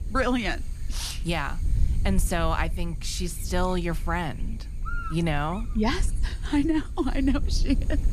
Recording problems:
electrical hum; noticeable; throughout; 50 Hz, 15 dB below the speech
wind noise on the microphone; occasional gusts; 25 dB below the speech
low rumble; faint; throughout; 25 dB below the speech

